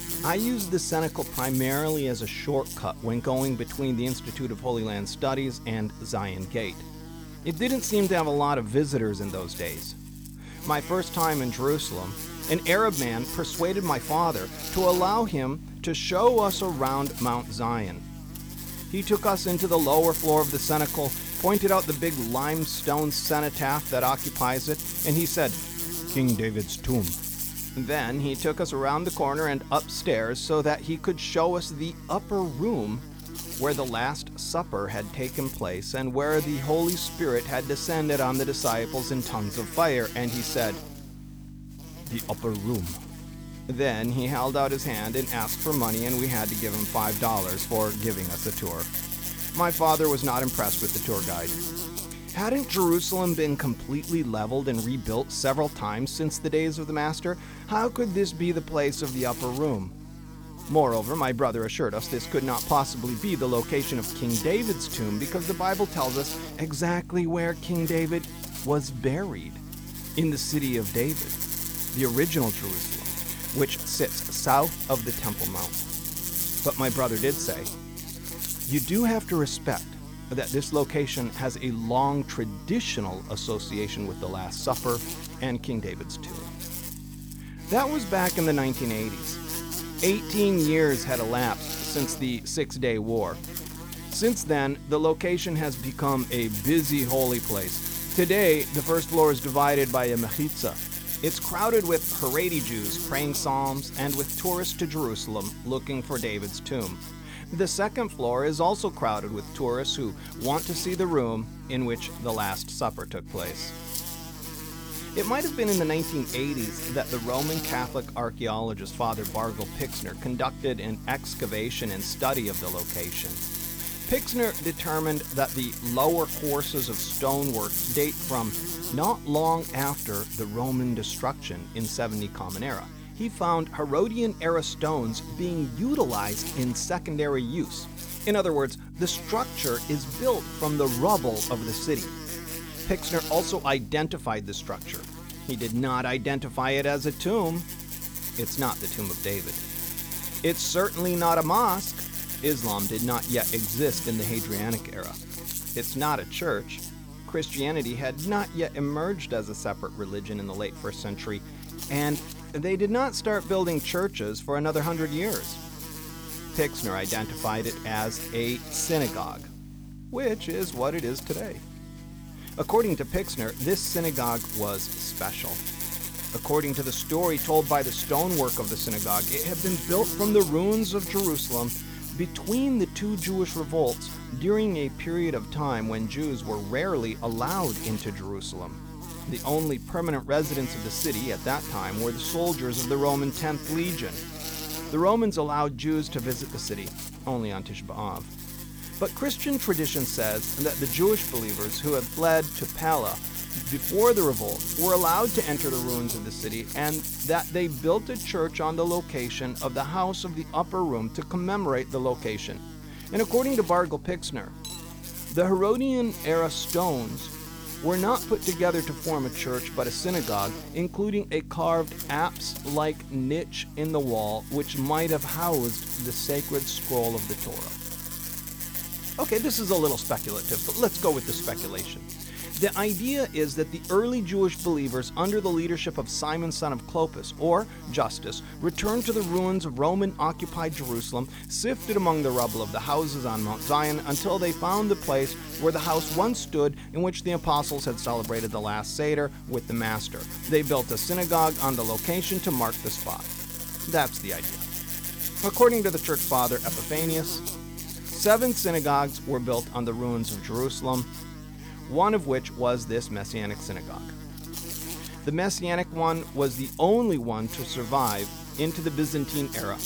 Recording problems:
electrical hum; loud; throughout; 50 Hz, 10 dB below the speech
clattering dishes; faint; at 3:35; peak 10 dB below the speech

